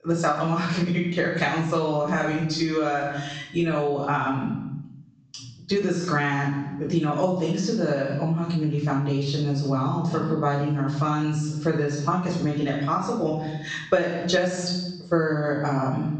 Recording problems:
off-mic speech; far
room echo; noticeable; dies away in 0.6 s
high frequencies cut off; noticeable; nothing above 8 kHz
squashed, flat; somewhat

